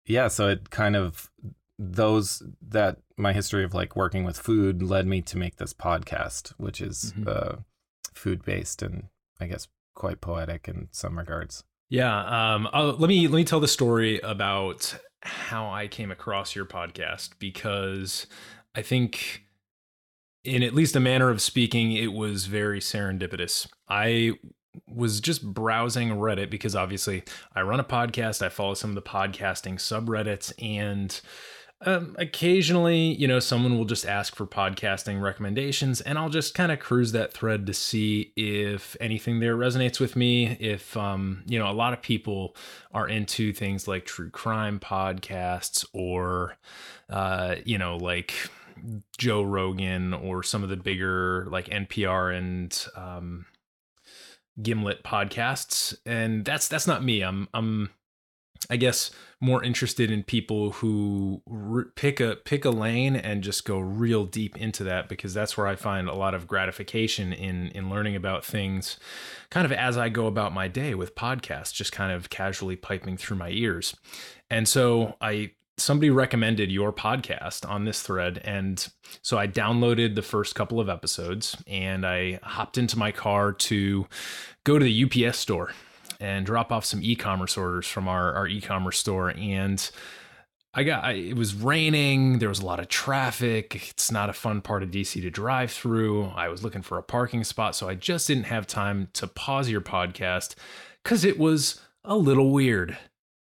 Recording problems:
none

